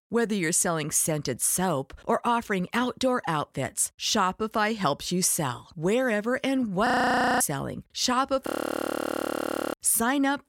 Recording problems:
audio freezing; at 7 s for 0.5 s and at 8.5 s for 1.5 s

